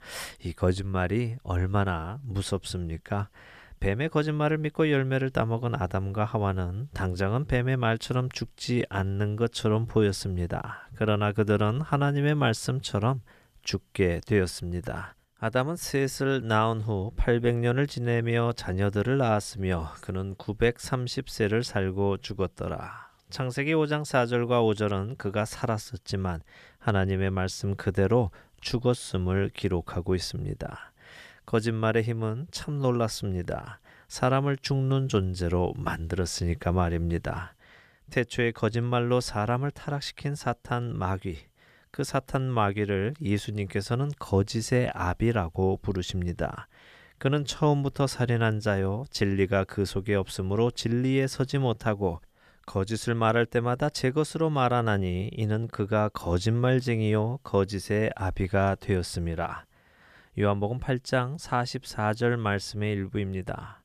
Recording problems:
none

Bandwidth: 14.5 kHz